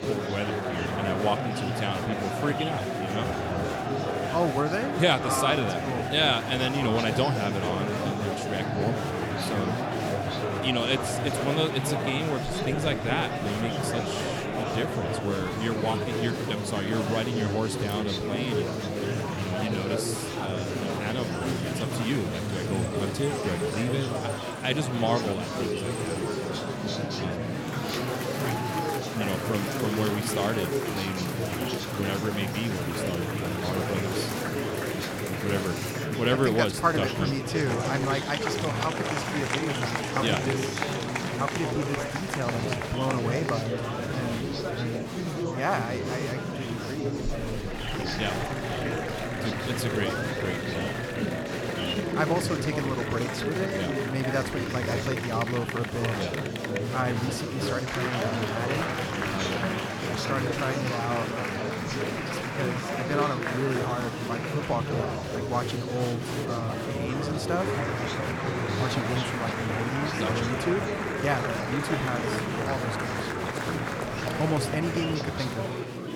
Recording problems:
murmuring crowd; very loud; throughout; 1 dB above the speech

